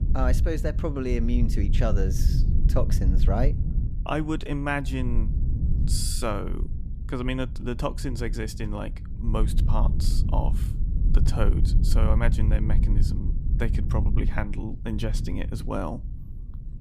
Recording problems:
low rumble; loud; throughout; 10 dB below the speech

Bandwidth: 14.5 kHz